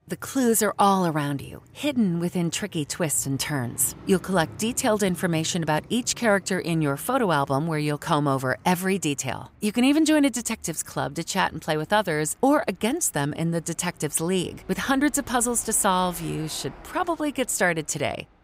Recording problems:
traffic noise; faint; throughout; 25 dB below the speech

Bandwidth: 15.5 kHz